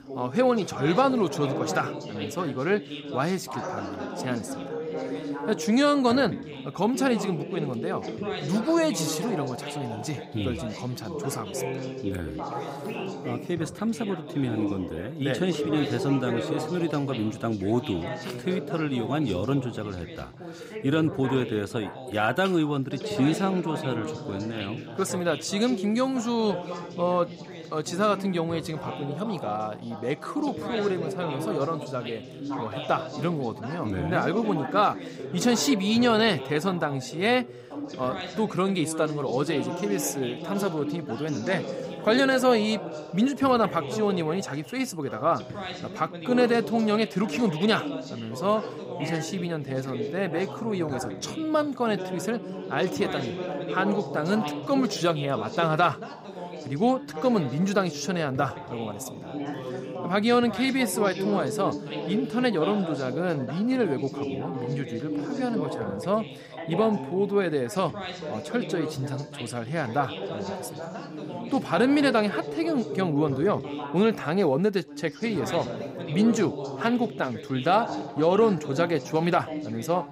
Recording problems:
background chatter; loud; throughout; 3 voices, 8 dB below the speech

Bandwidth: 15.5 kHz